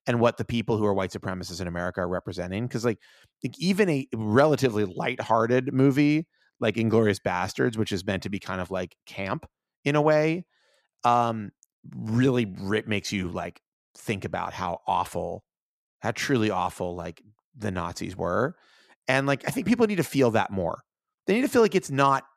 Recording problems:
none

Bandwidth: 14.5 kHz